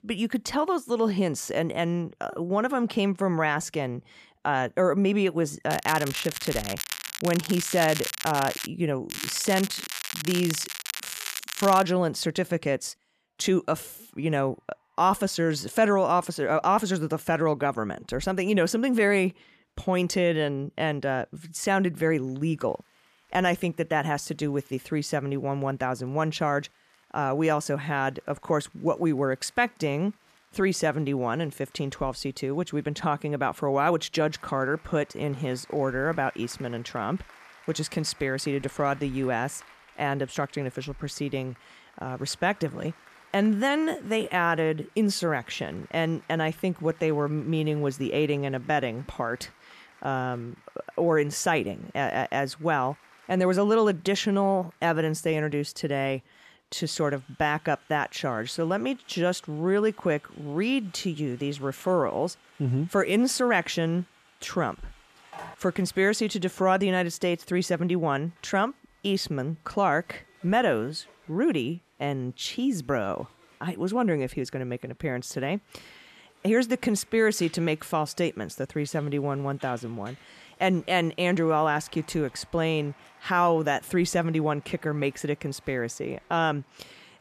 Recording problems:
crackling; loud; from 5.5 to 8.5 s and from 9 to 12 s; 6 dB below the speech
crowd noise; faint; throughout; 30 dB below the speech
phone ringing; faint; at 1:05; peak 15 dB below the speech

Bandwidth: 14.5 kHz